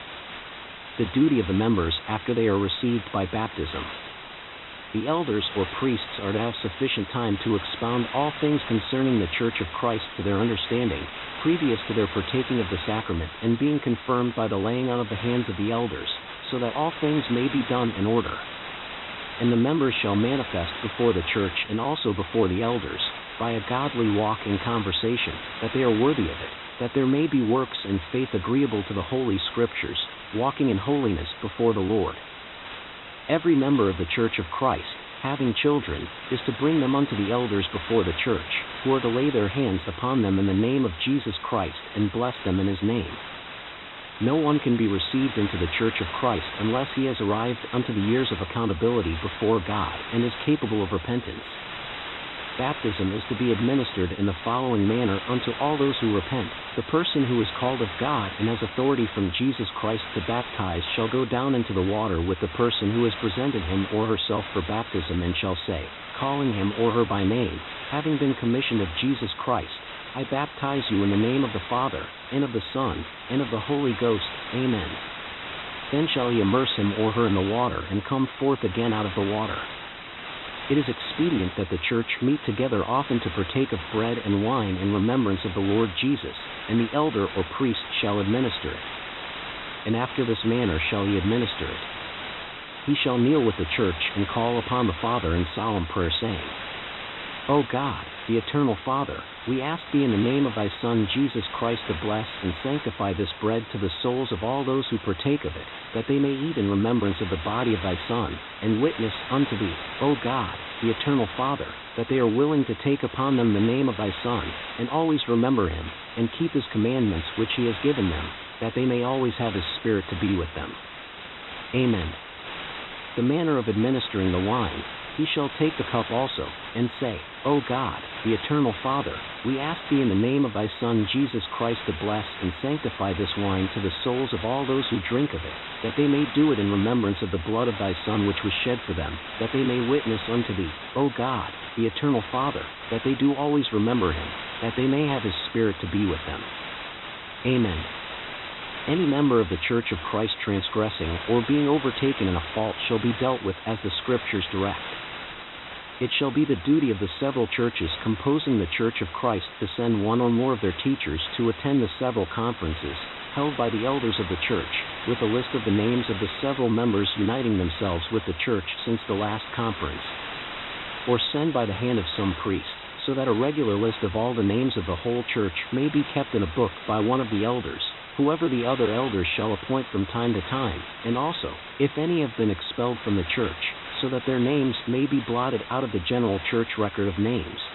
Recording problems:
high frequencies cut off; severe; nothing above 4 kHz
hiss; loud; throughout; 10 dB below the speech

